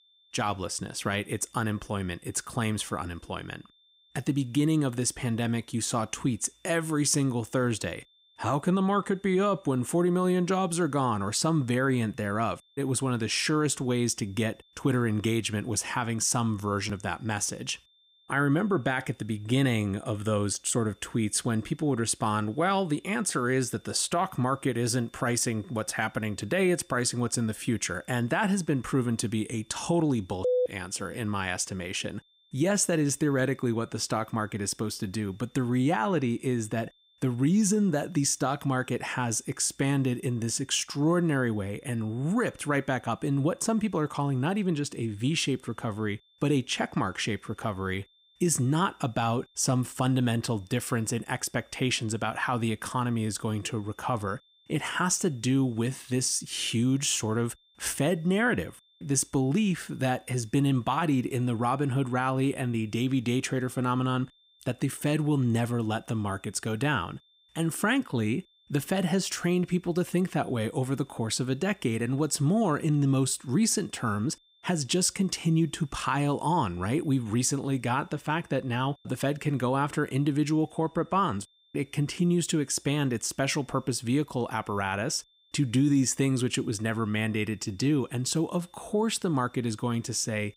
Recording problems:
high-pitched whine; faint; throughout; 3.5 kHz, 35 dB below the speech

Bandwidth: 15.5 kHz